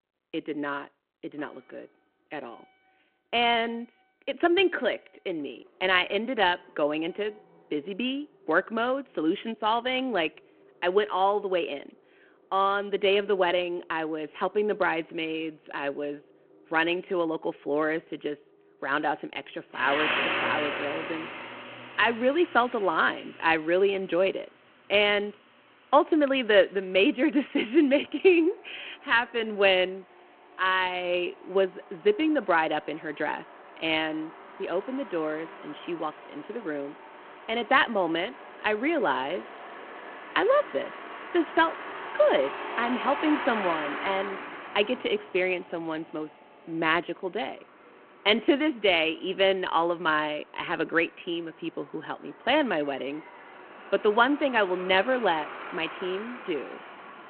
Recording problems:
phone-call audio
traffic noise; noticeable; throughout; 10 dB below the speech

